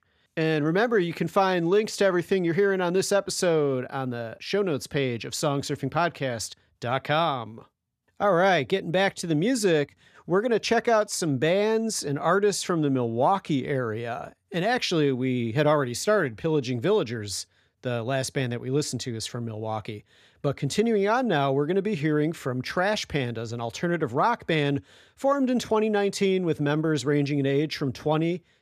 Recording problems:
none

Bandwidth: 14.5 kHz